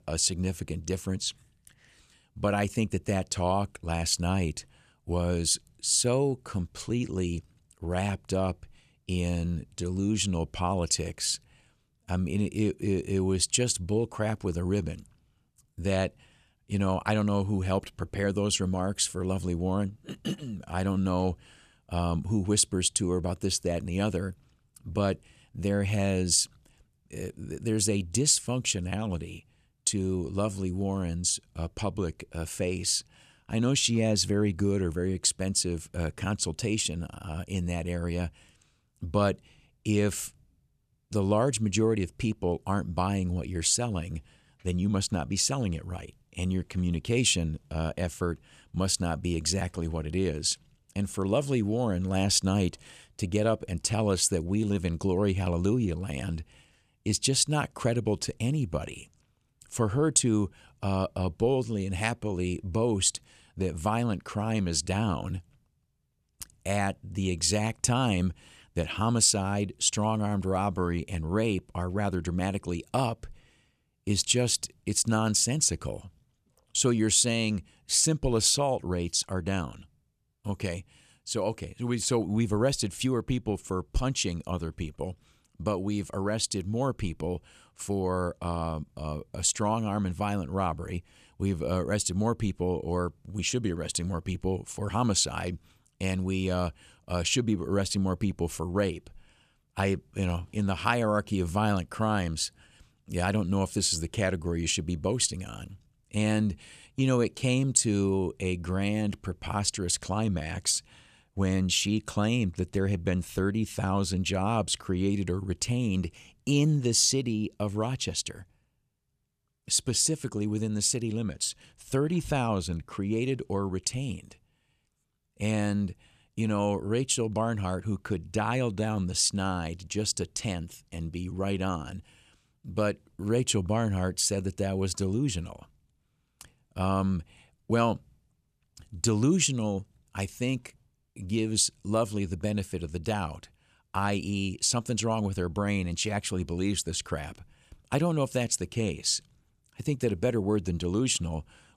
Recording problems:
none

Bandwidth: 14.5 kHz